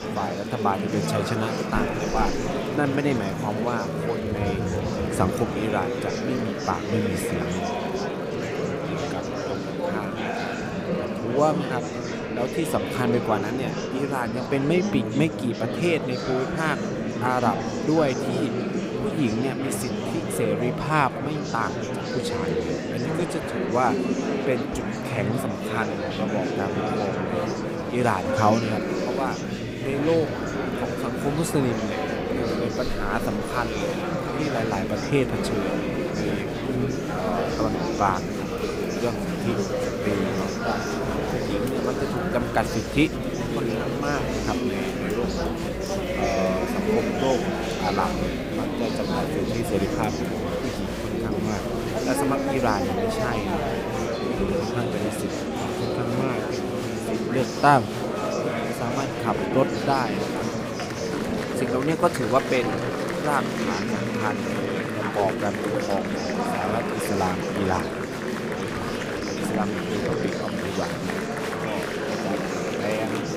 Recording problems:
murmuring crowd; very loud; throughout; 1 dB above the speech

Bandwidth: 15.5 kHz